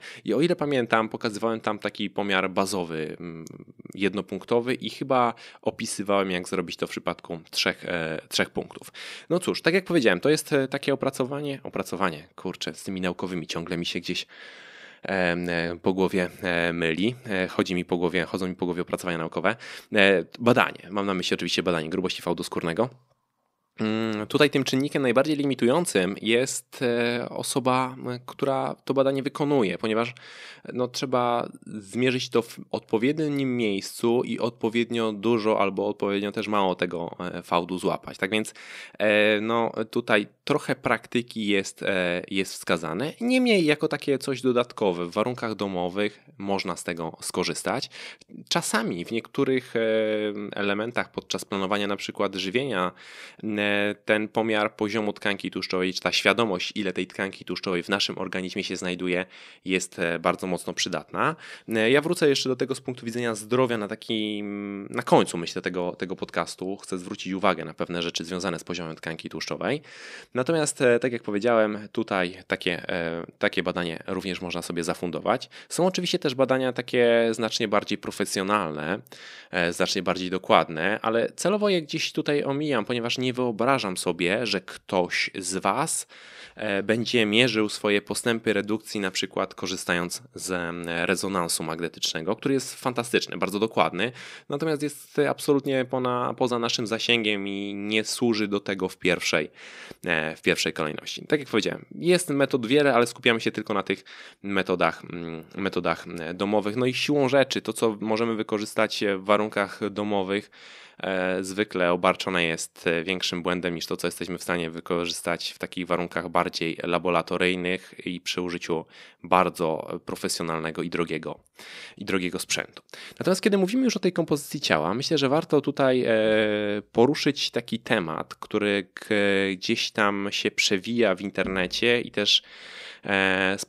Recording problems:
none

